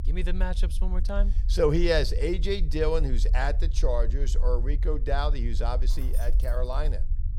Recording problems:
low rumble; faint; throughout; 20 dB below the speech
jangling keys; faint; at 6 s; peak 15 dB below the speech

